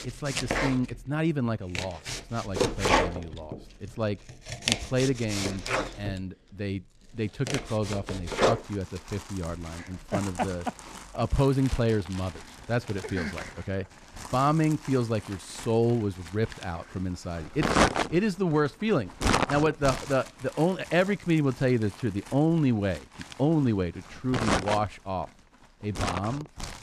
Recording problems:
household noises; loud; throughout; 2 dB below the speech

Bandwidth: 14.5 kHz